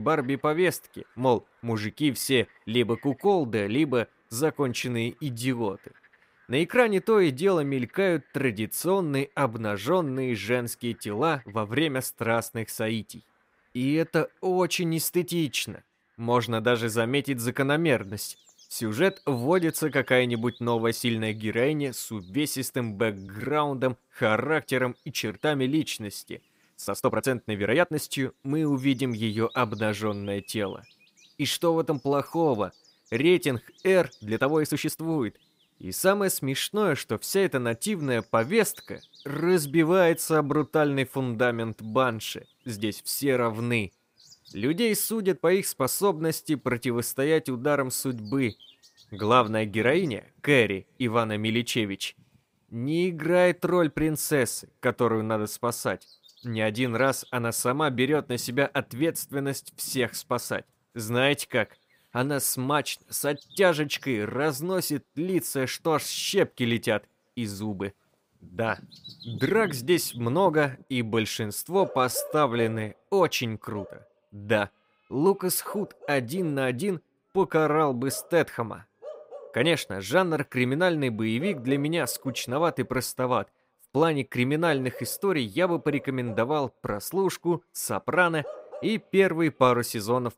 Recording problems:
animal sounds; faint; throughout; 20 dB below the speech
abrupt cut into speech; at the start
uneven, jittery; strongly; from 1 s to 1:13

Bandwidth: 15.5 kHz